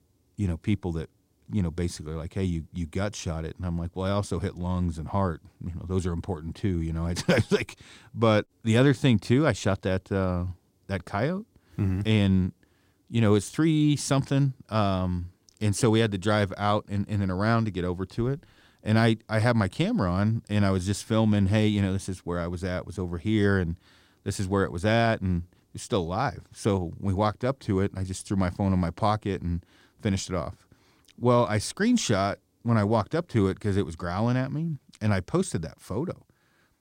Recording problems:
none

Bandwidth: 16 kHz